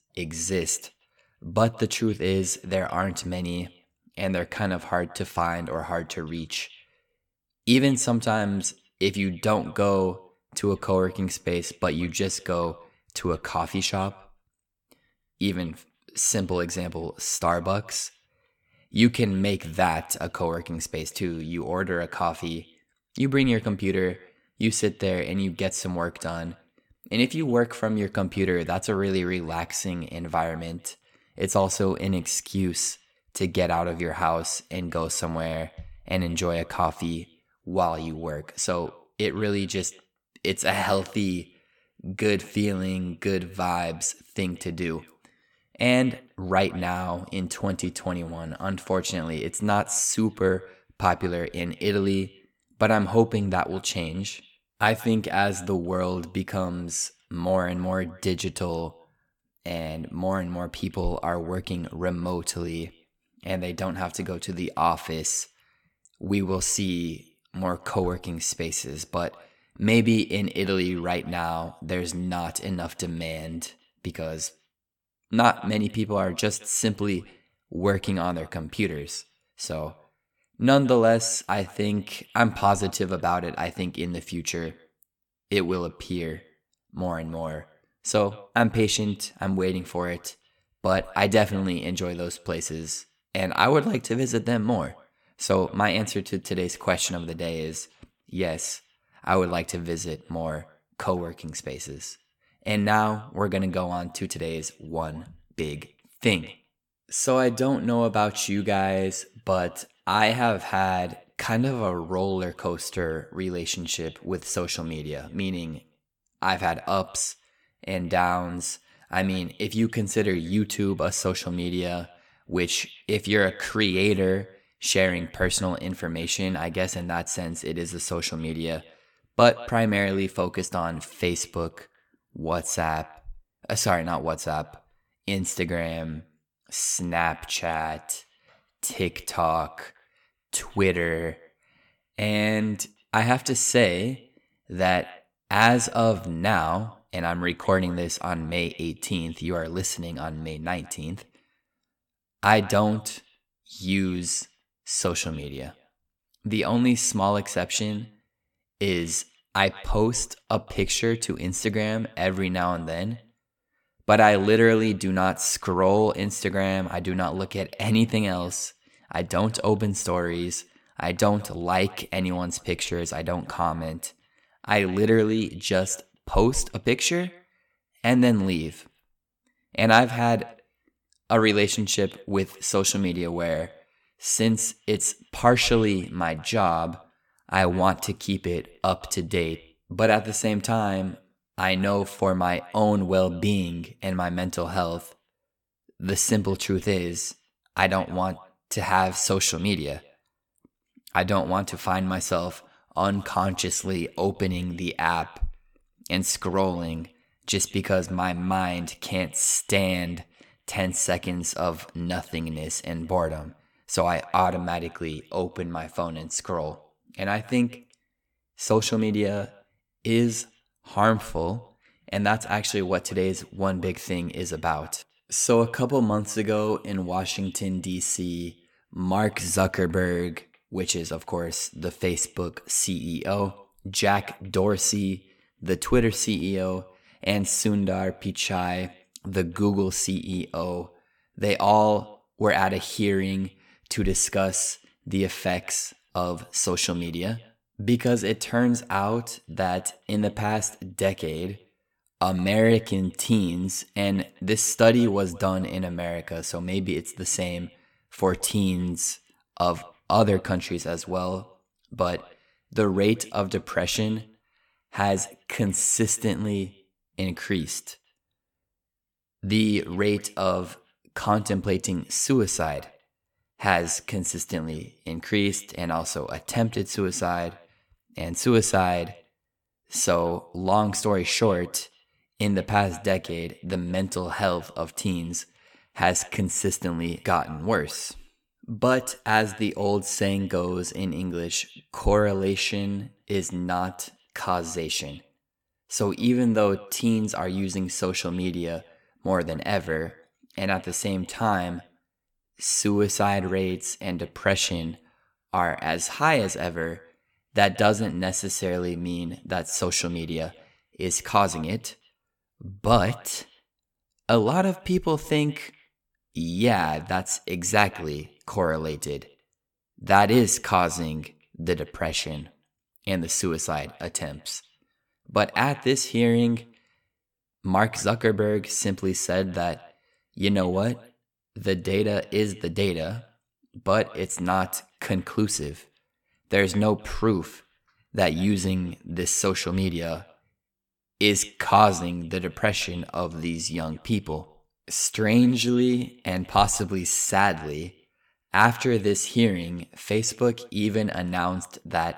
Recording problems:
echo of what is said; faint; throughout; 170 ms later, 25 dB below the speech

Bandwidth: 17.5 kHz